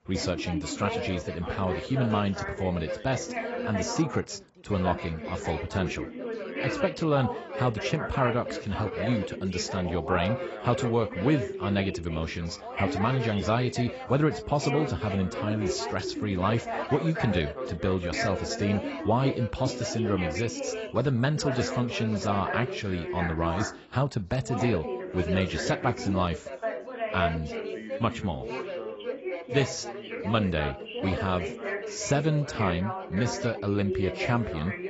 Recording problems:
garbled, watery; badly; nothing above 7.5 kHz
background chatter; loud; throughout; 4 voices, 5 dB below the speech

